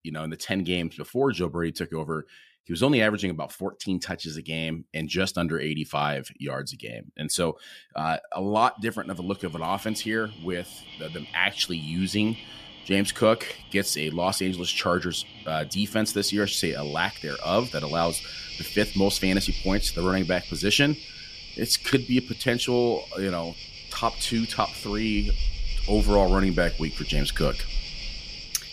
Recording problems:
animal sounds; noticeable; from 9 s on; 10 dB below the speech

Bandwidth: 15 kHz